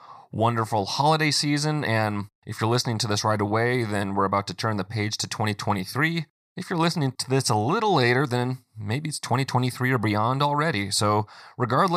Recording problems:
abrupt cut into speech; at the end

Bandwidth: 15 kHz